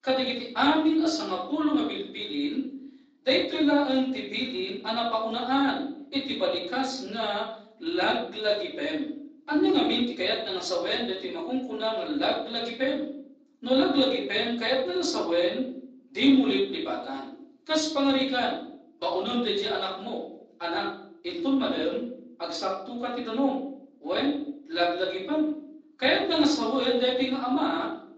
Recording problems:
off-mic speech; far
room echo; noticeable; dies away in 0.7 s
garbled, watery; slightly; nothing above 7.5 kHz
thin; very slightly; fading below 300 Hz

